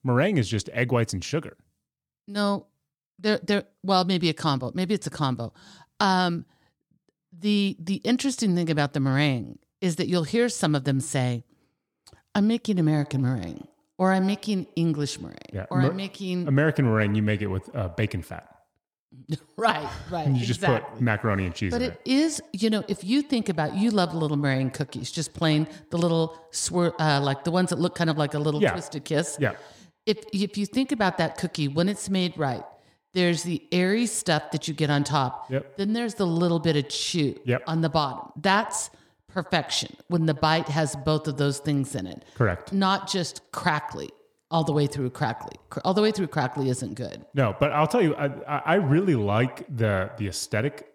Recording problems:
echo of what is said; noticeable; from 13 s on; 80 ms later, 20 dB below the speech

